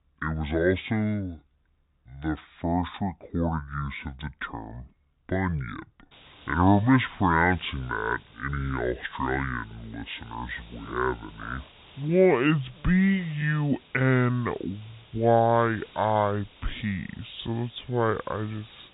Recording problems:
high frequencies cut off; severe; nothing above 4 kHz
wrong speed and pitch; too slow and too low; 0.6 times normal speed
hiss; faint; from 6 s on; 25 dB below the speech

